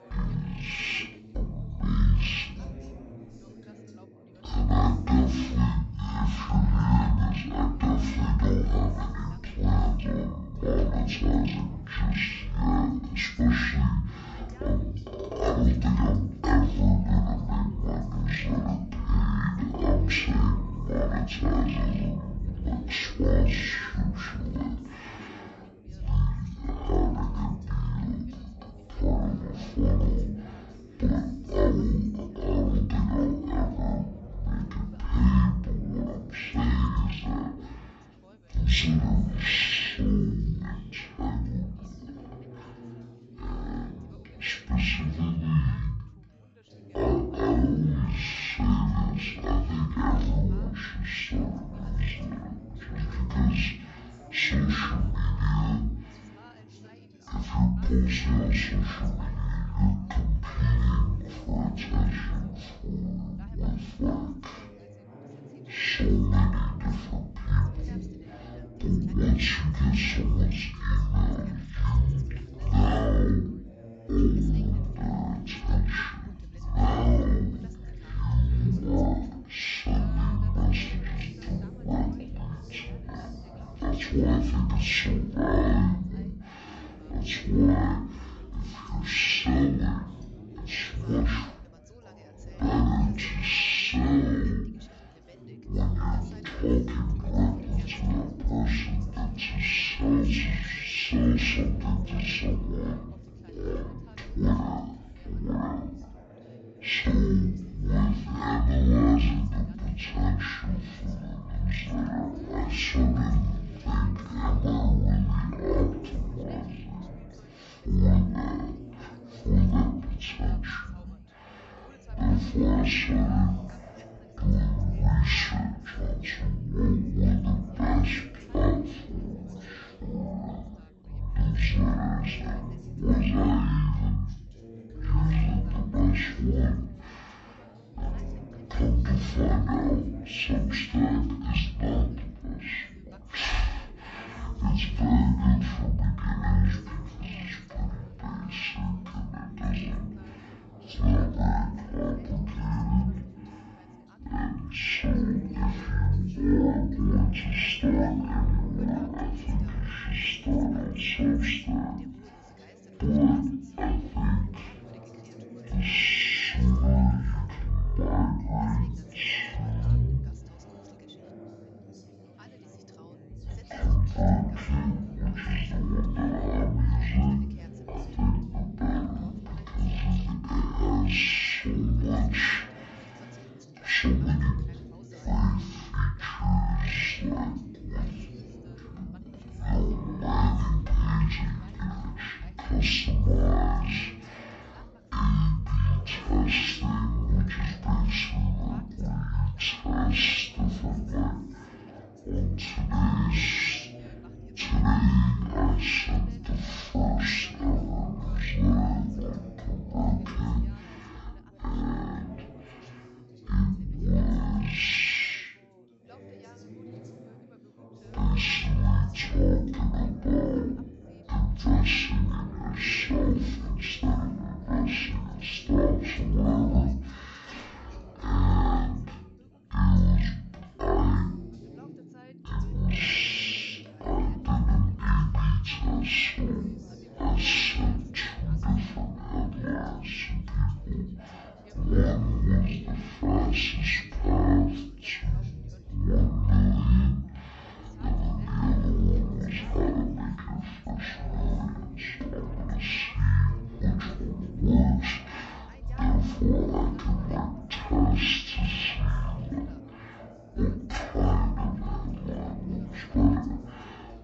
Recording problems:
off-mic speech; far
wrong speed and pitch; too slow and too low; 0.5 times normal speed
room echo; slight; dies away in 0.4 s
background chatter; faint; throughout; 4 voices, 20 dB below the speech

